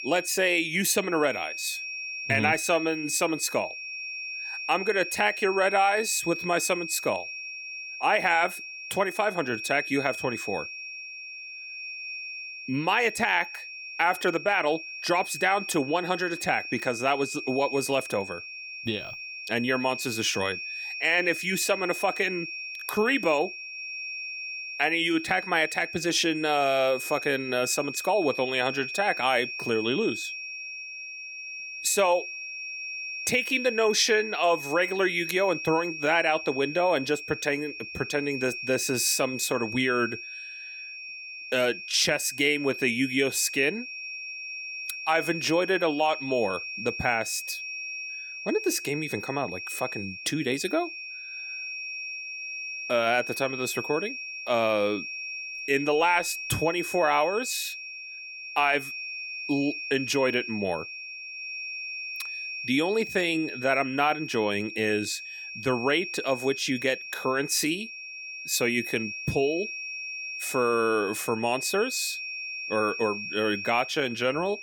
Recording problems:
high-pitched whine; loud; throughout; 2.5 kHz, 8 dB below the speech

